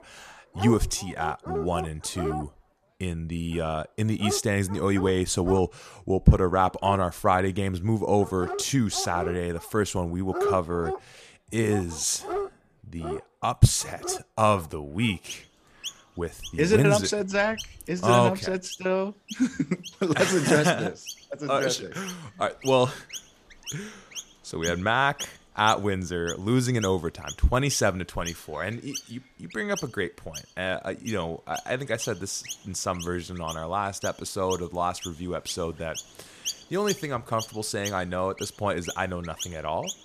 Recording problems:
animal sounds; noticeable; throughout; 10 dB below the speech

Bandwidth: 14.5 kHz